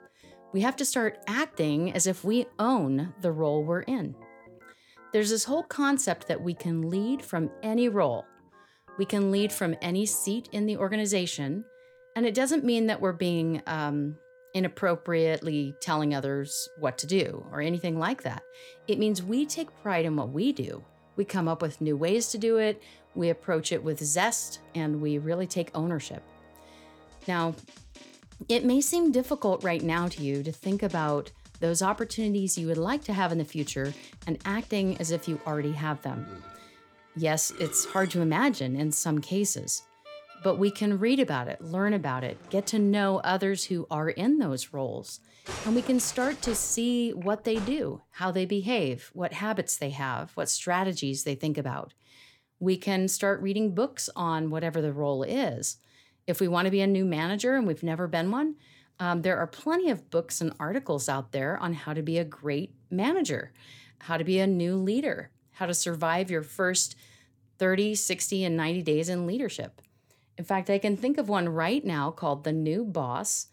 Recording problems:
background music; faint; until 48 s; 20 dB below the speech

